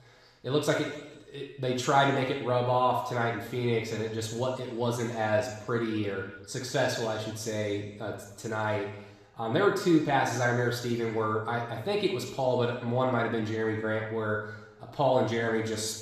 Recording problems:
room echo; noticeable; dies away in 1 s
off-mic speech; somewhat distant

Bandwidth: 14.5 kHz